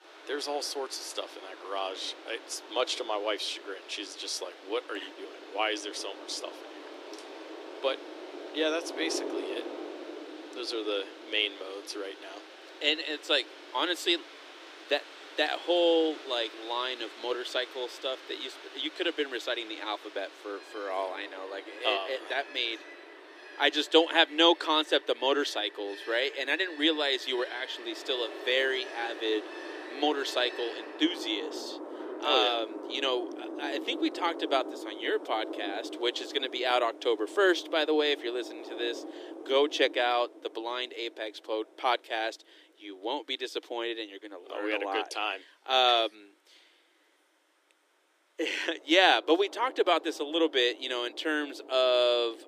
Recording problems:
thin; very; fading below 300 Hz
rain or running water; noticeable; throughout; 15 dB below the speech

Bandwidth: 15 kHz